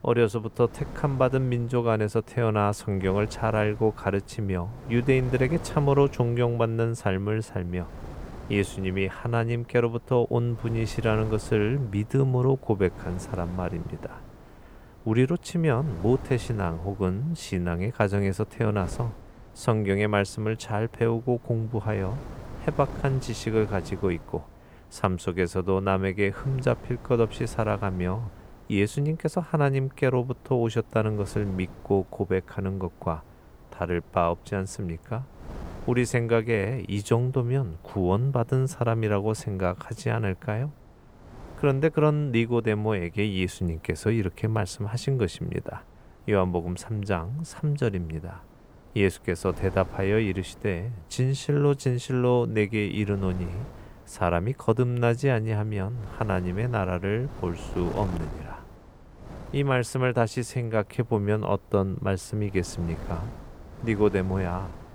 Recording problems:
wind noise on the microphone; occasional gusts; 20 dB below the speech

